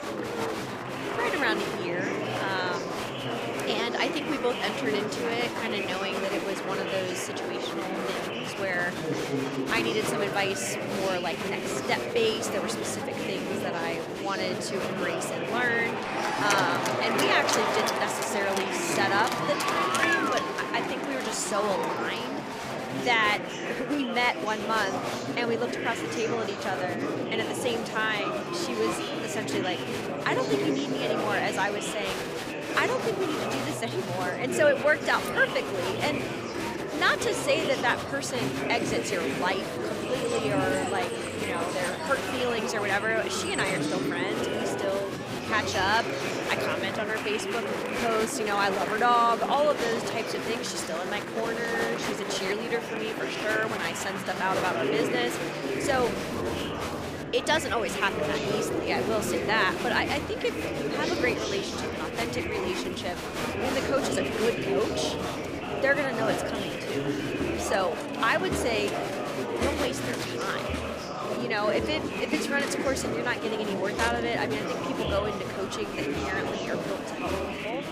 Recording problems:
murmuring crowd; loud; throughout; 1 dB below the speech

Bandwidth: 15 kHz